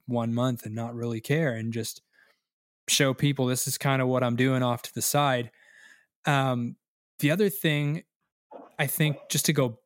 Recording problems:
none

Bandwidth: 16 kHz